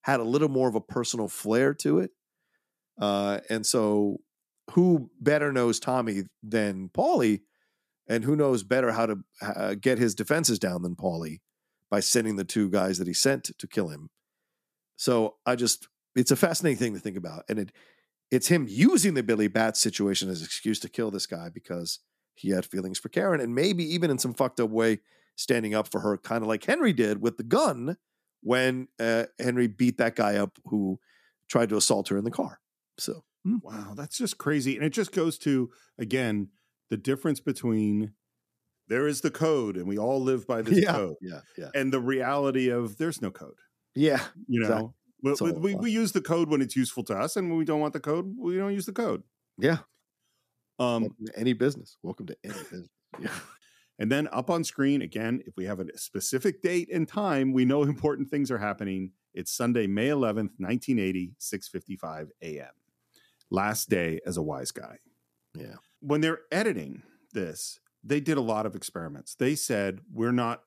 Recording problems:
none

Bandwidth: 14.5 kHz